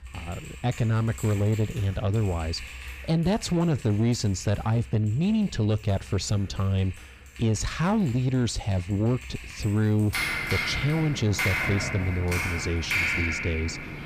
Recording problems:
distortion; slight; 10 dB below the speech
household noises; loud; throughout; 4 dB below the speech

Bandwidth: 15 kHz